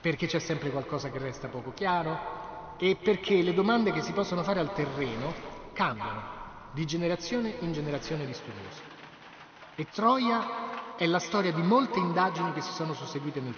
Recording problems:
echo of what is said; strong; throughout; 200 ms later, 9 dB below the speech
high frequencies cut off; noticeable; nothing above 6.5 kHz
rain or running water; noticeable; throughout; 20 dB below the speech

